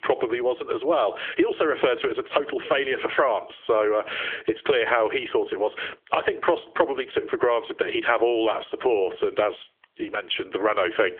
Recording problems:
squashed, flat; heavily
phone-call audio; nothing above 3.5 kHz

